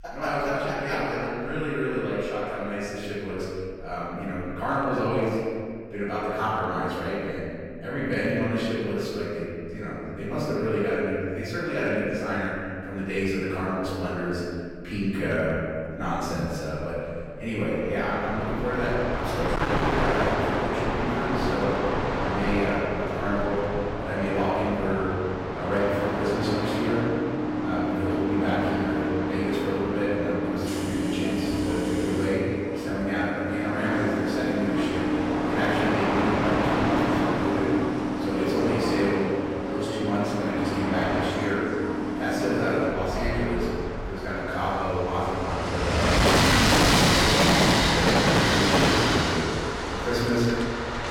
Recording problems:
distortion; heavy; 4% of the sound clipped
room echo; strong; dies away in 1.9 s
off-mic speech; far
train or aircraft noise; very loud; from 18 s on; 2 dB above the speech
electrical hum; very faint; until 24 s; 60 Hz, 30 dB below the speech

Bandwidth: 17 kHz